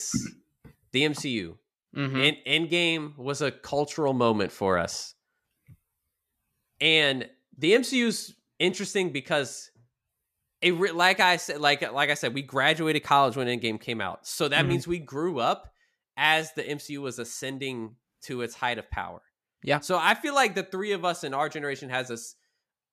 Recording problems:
abrupt cut into speech; at the start

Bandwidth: 14.5 kHz